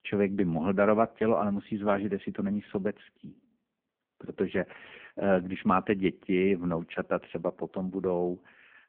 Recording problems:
phone-call audio; poor line

